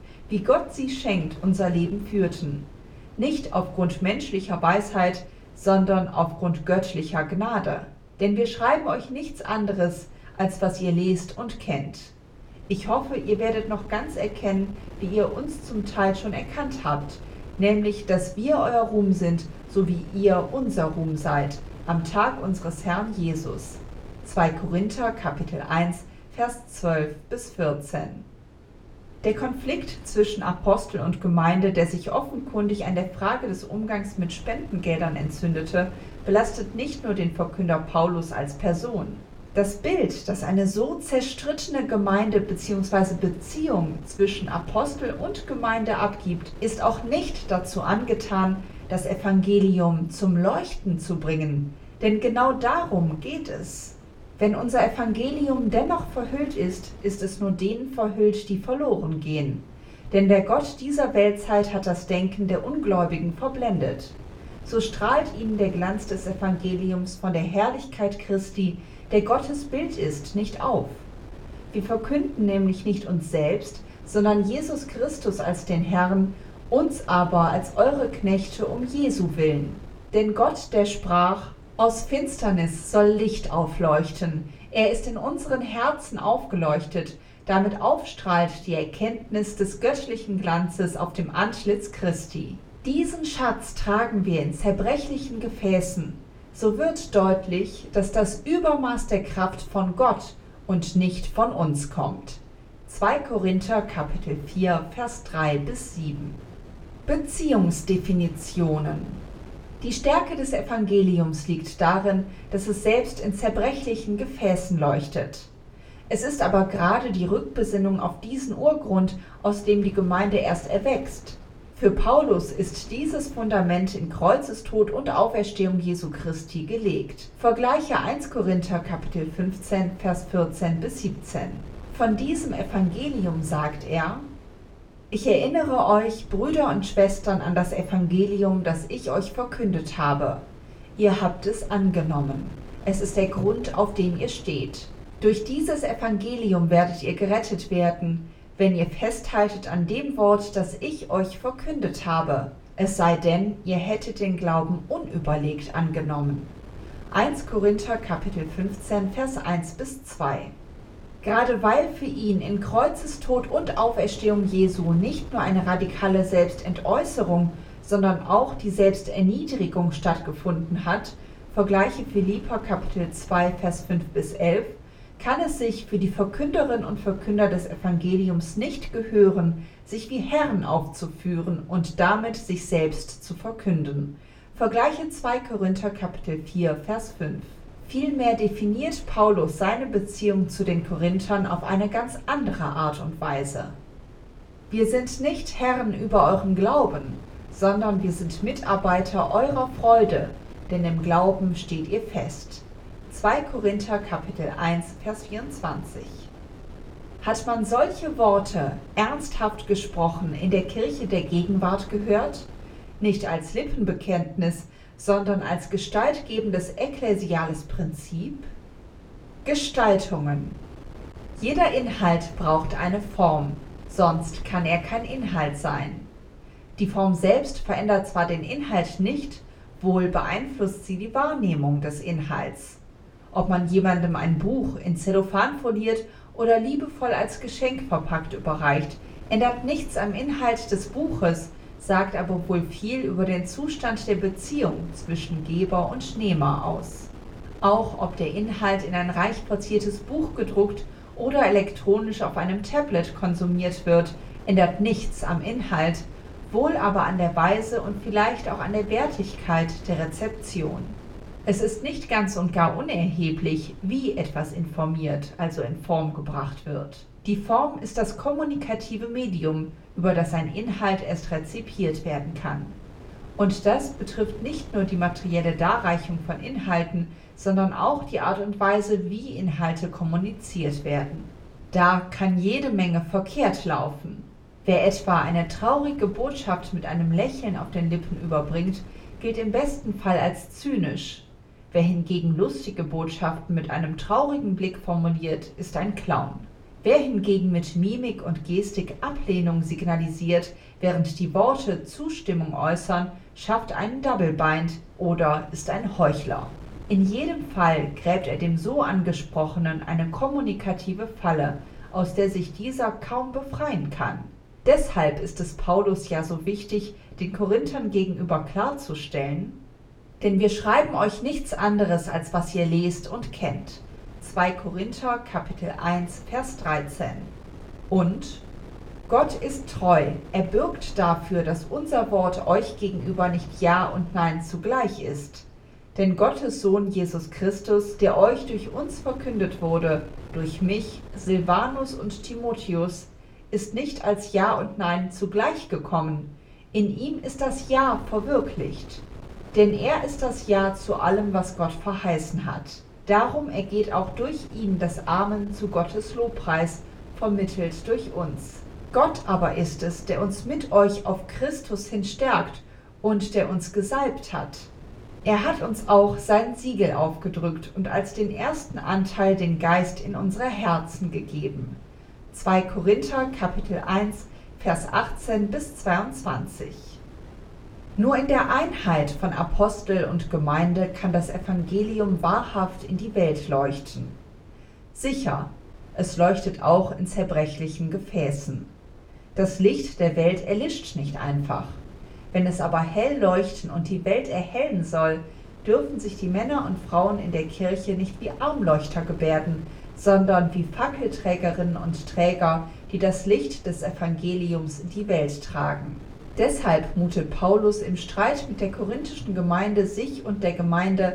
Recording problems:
off-mic speech; far
room echo; very slight; dies away in 0.3 s
wind noise on the microphone; occasional gusts; 25 dB below the speech

